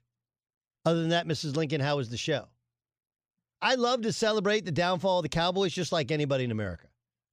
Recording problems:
none

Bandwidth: 15 kHz